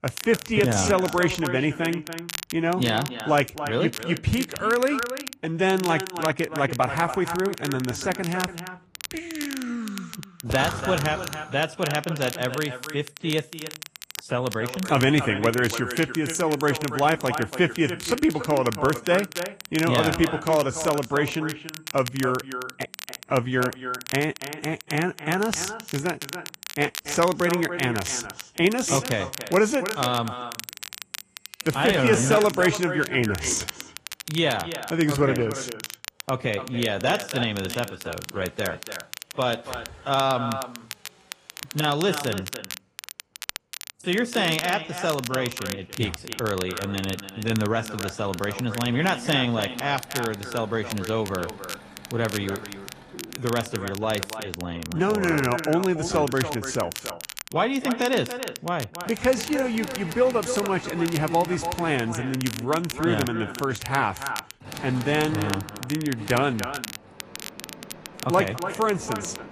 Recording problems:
echo of what is said; strong; throughout; 290 ms later, 10 dB below the speech
garbled, watery; slightly; nothing above 11 kHz
machinery noise; noticeable; throughout; 20 dB below the speech
crackle, like an old record; noticeable; 10 dB below the speech

